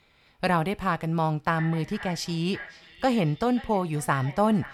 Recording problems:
echo of what is said; noticeable; from 1.5 s on; 530 ms later, 15 dB below the speech

